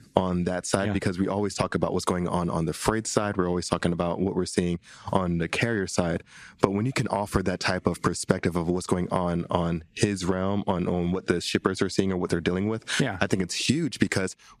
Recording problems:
squashed, flat; somewhat

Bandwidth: 14.5 kHz